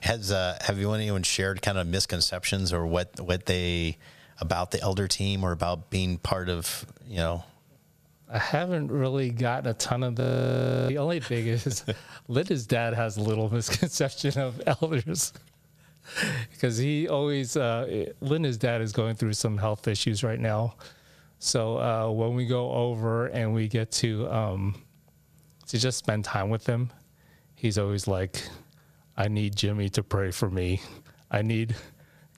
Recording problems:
squashed, flat; somewhat
audio freezing; at 10 s for 0.5 s

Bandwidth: 15 kHz